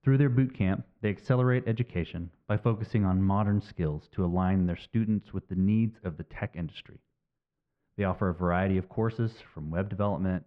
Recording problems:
muffled; very; fading above 1.5 kHz

